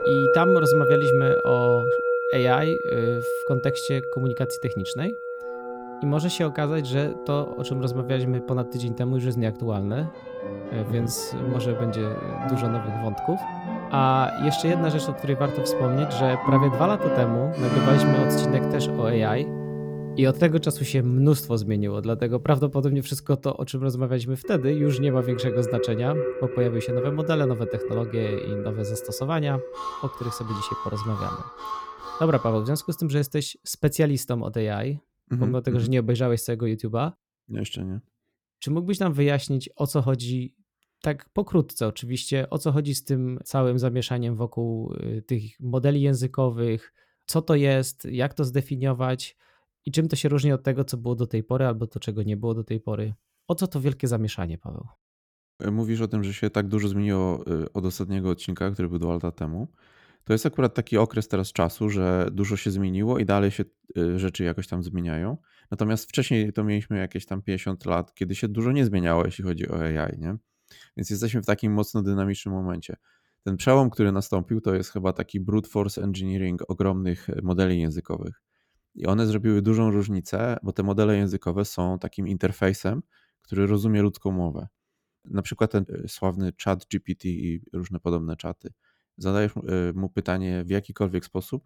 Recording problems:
background music; loud; until 32 s; 2 dB below the speech

